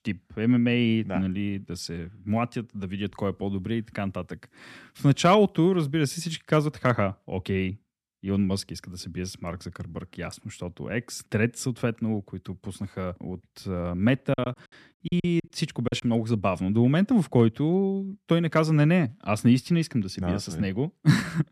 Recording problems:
choppy; very; from 14 to 16 s; 20% of the speech affected

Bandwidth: 14 kHz